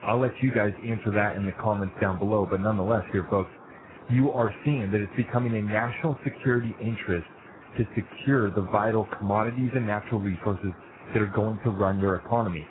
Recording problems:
garbled, watery; badly; nothing above 4 kHz
hiss; faint; throughout; 20 dB below the speech

